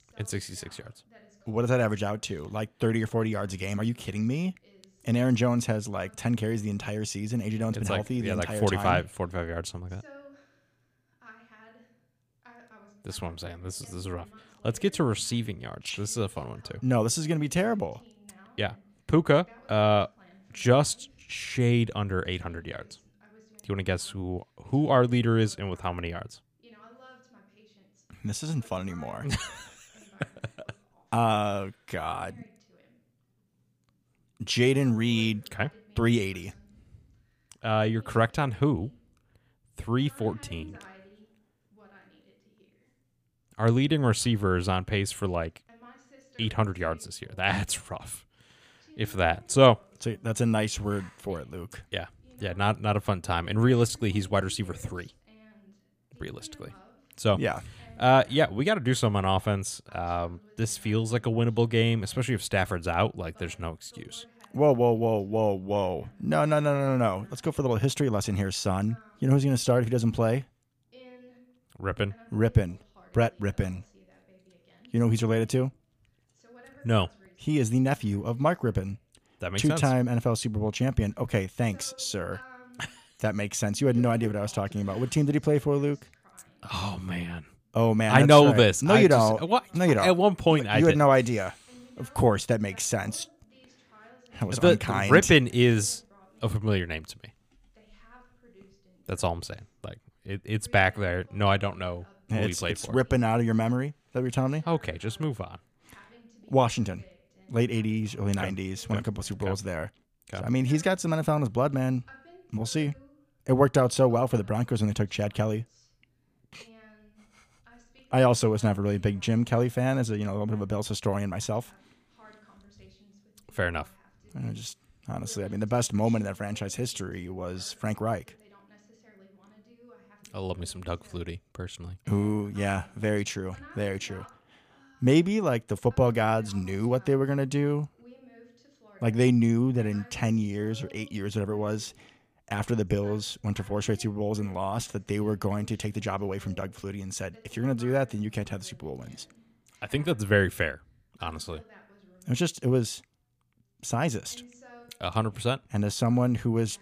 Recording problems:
voice in the background; faint; throughout; 30 dB below the speech

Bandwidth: 15 kHz